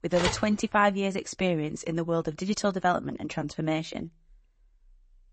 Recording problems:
garbled, watery; slightly; nothing above 8 kHz
phone ringing; noticeable; at the start; peak 2 dB below the speech

